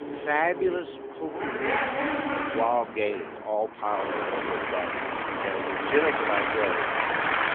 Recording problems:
phone-call audio; nothing above 3.5 kHz
traffic noise; very loud; throughout; 1 dB above the speech

